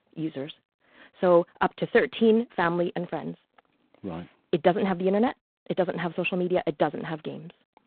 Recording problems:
phone-call audio; poor line; nothing above 3.5 kHz

